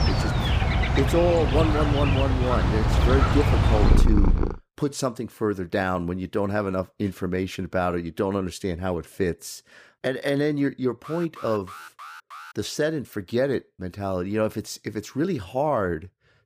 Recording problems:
animal sounds; very loud; until 4.5 s; 4 dB above the speech
alarm; faint; from 11 to 13 s; peak 15 dB below the speech

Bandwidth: 15 kHz